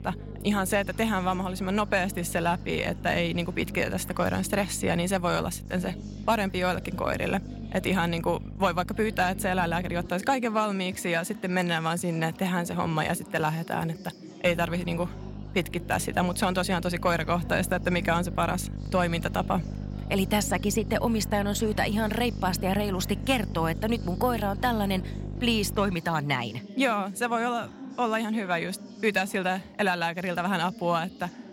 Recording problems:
chatter from many people; noticeable; throughout; 15 dB below the speech
electrical hum; faint; until 10 s and from 14 to 26 s; 50 Hz, 20 dB below the speech

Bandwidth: 16 kHz